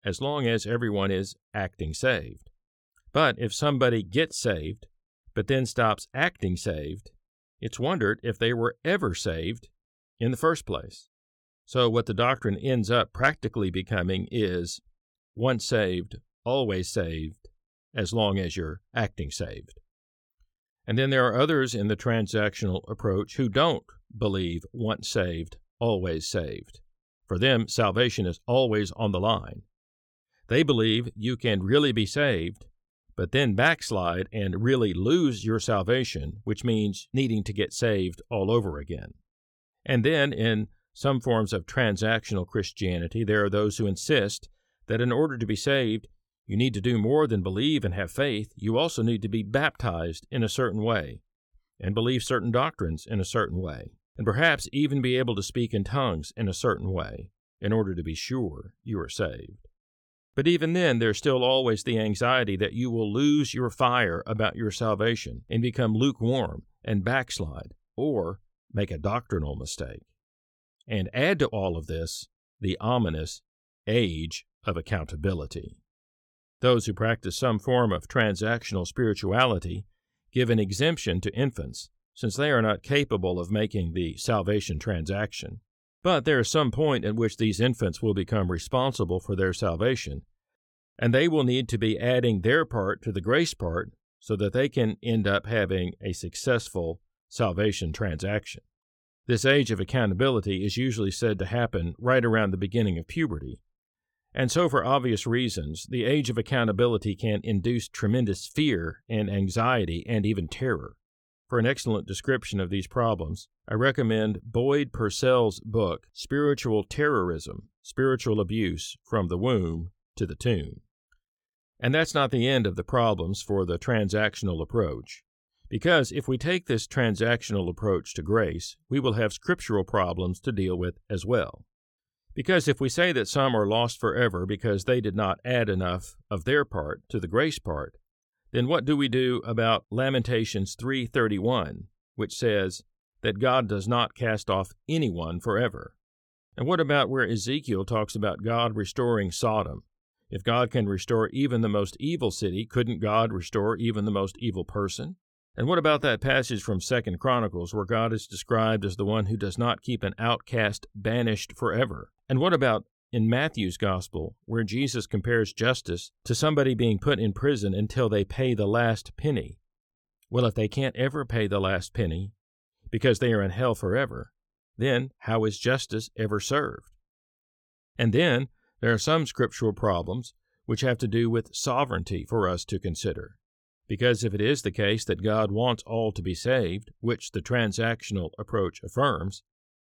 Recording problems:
none

